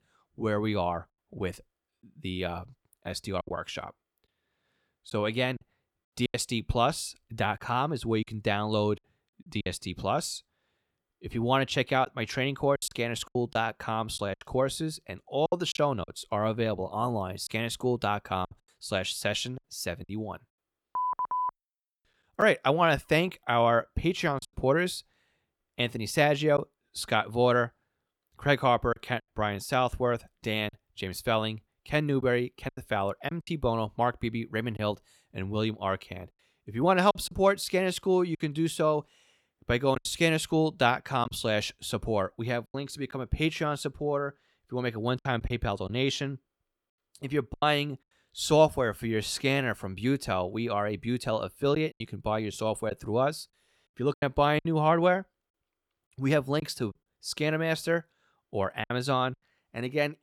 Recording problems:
choppy; occasionally; 5% of the speech affected

